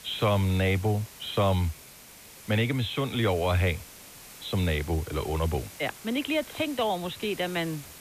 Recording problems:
high frequencies cut off; severe; nothing above 4 kHz
hiss; noticeable; throughout; 15 dB below the speech

